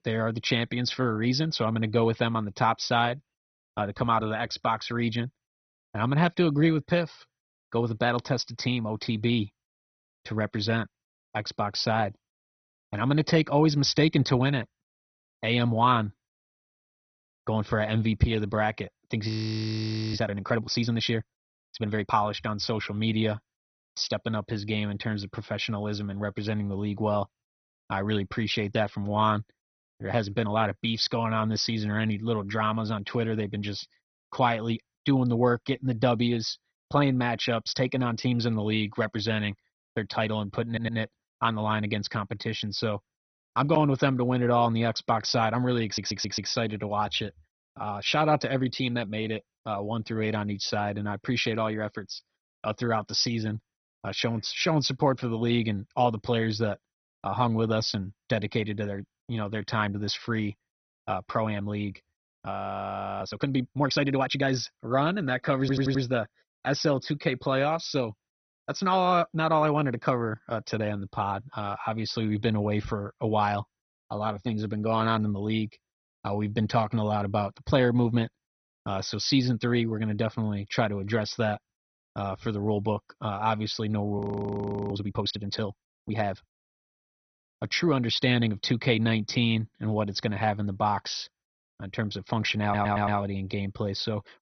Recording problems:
garbled, watery; badly; nothing above 6 kHz
audio freezing; at 19 s for 1 s, at 1:03 for 0.5 s and at 1:24 for 0.5 s
audio stuttering; 4 times, first at 41 s

